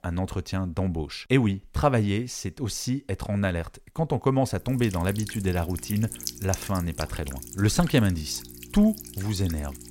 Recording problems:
electrical hum; noticeable; from 4.5 s on; 60 Hz, 10 dB below the speech

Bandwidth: 16 kHz